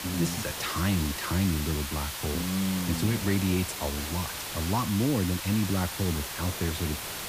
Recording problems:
hiss; loud; throughout; 4 dB below the speech

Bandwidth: 15 kHz